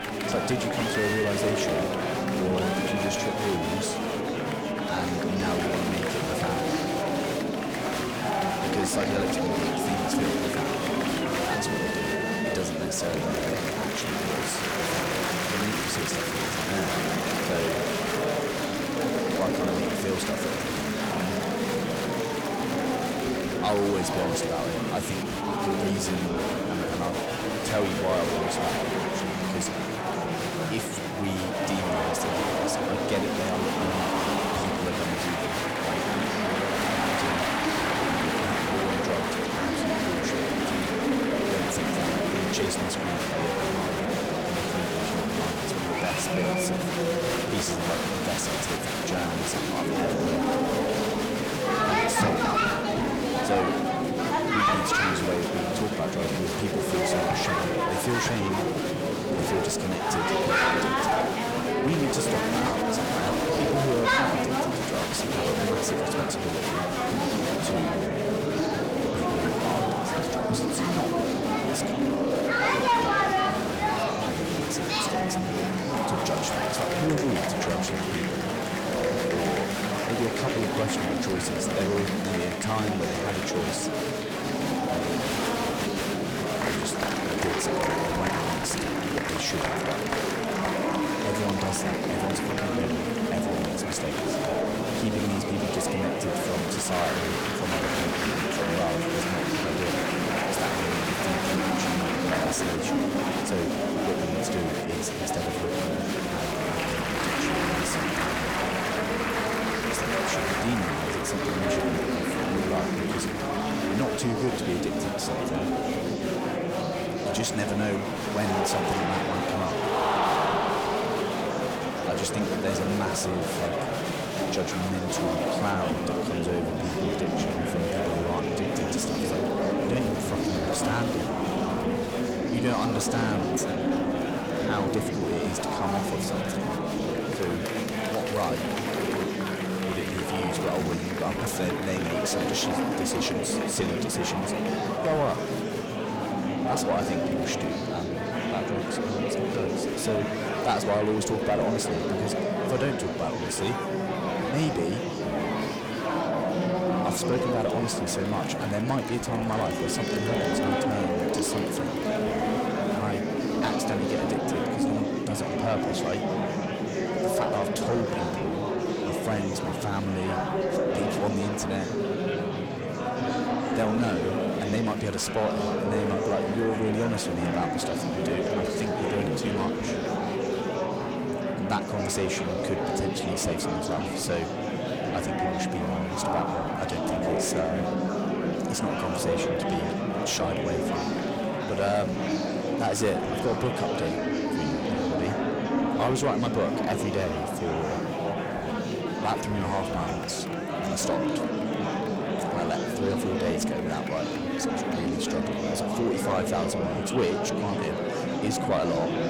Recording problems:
distortion; slight; 10 dB below the speech
murmuring crowd; very loud; throughout; 4 dB above the speech
crackling; noticeable; at 2:21; 20 dB below the speech

